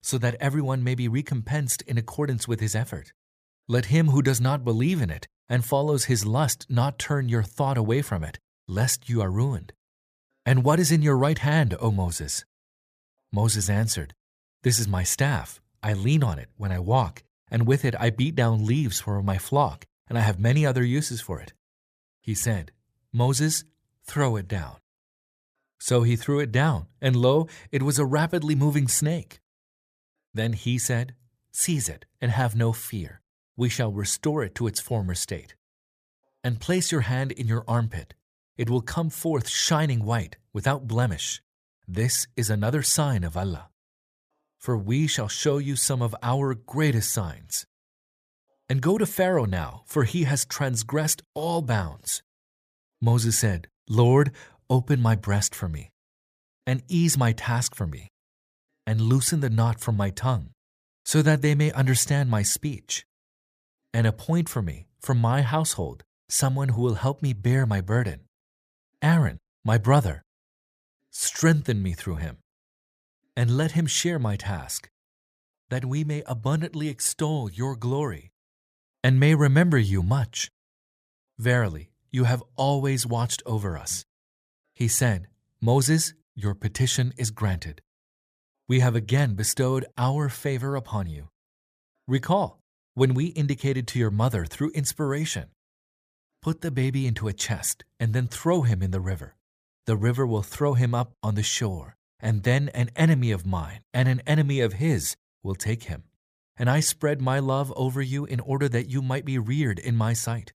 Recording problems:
none

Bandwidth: 15 kHz